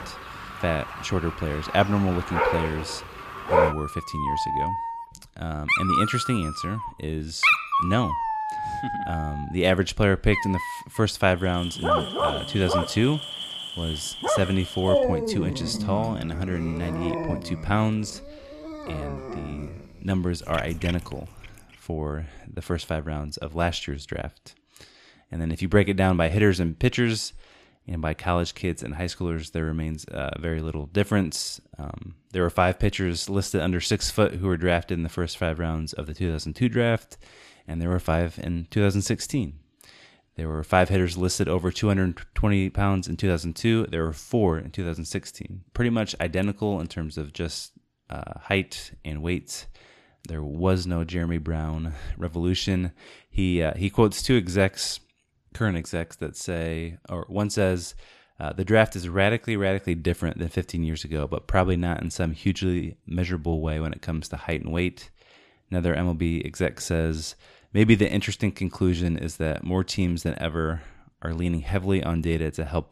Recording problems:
animal sounds; loud; until 21 s; 2 dB below the speech

